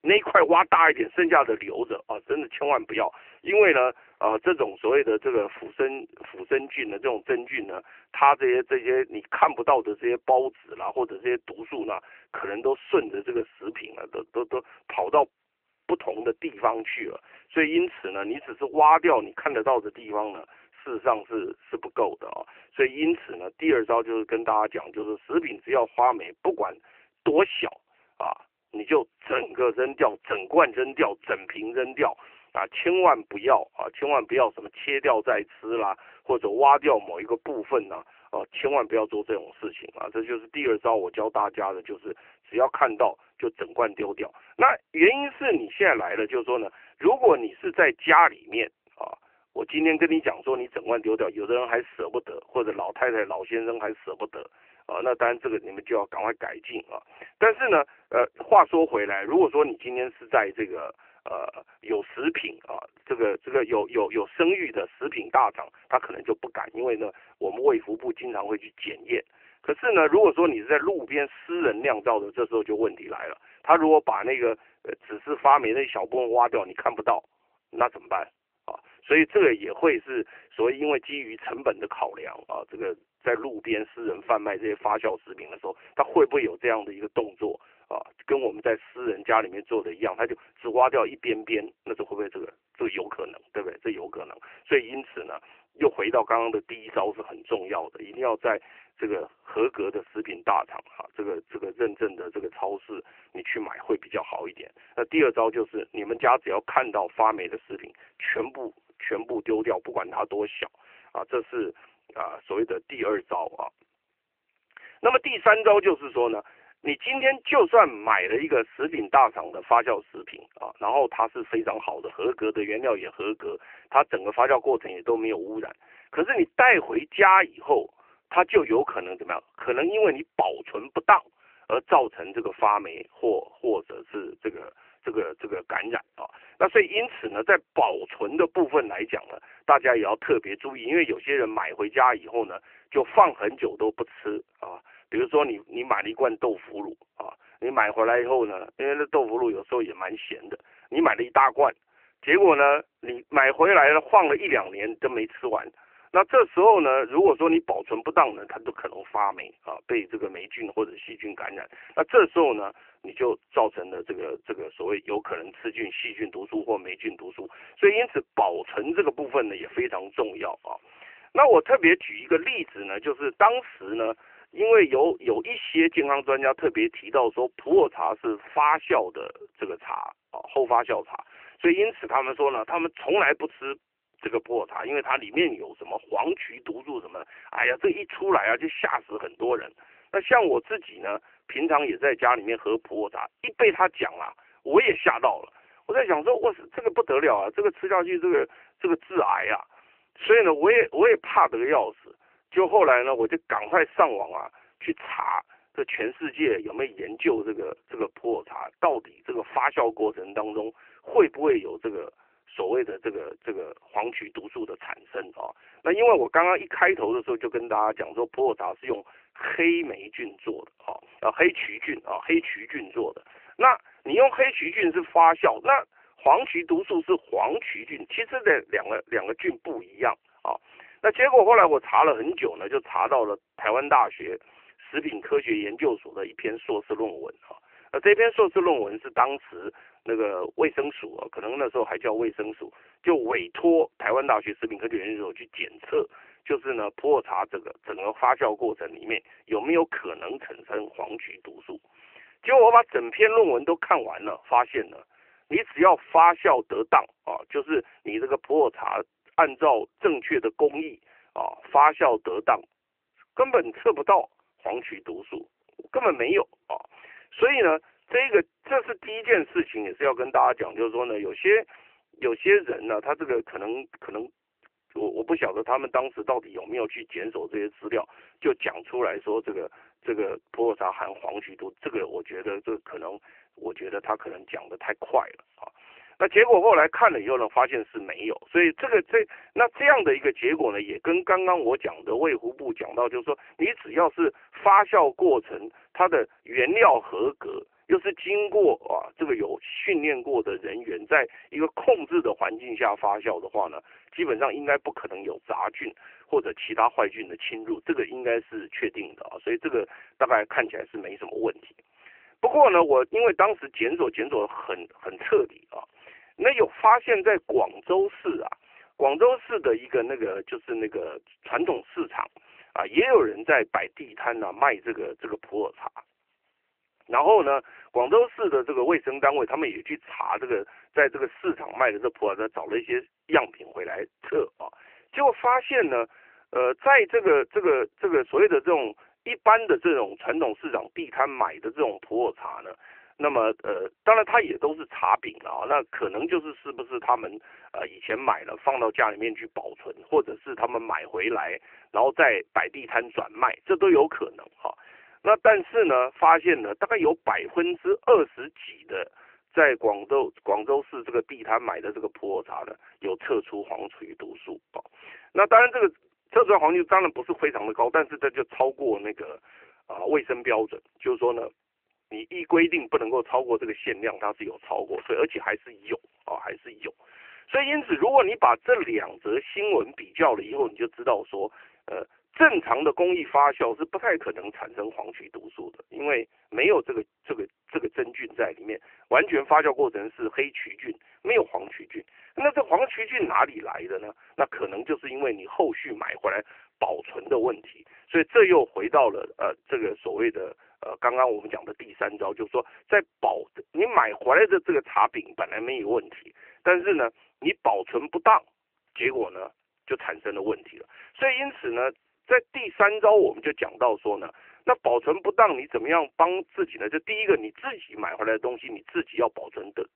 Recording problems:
phone-call audio; nothing above 3 kHz

